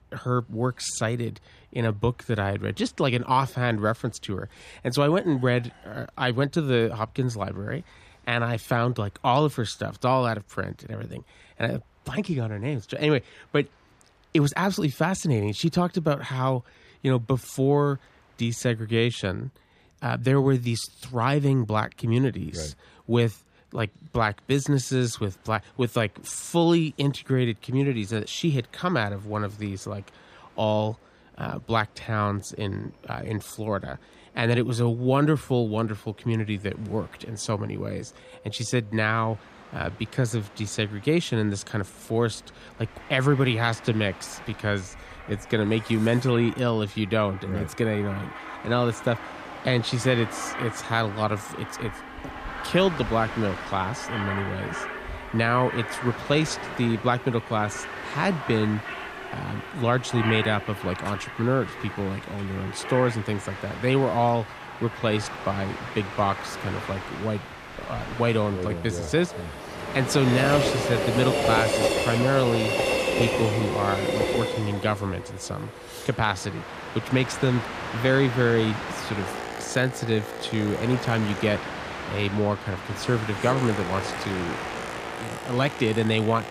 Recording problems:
train or aircraft noise; loud; throughout; 6 dB below the speech

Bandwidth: 14.5 kHz